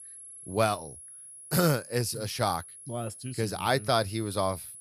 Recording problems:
high-pitched whine; noticeable; throughout; 10.5 kHz, 15 dB below the speech

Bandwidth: 14.5 kHz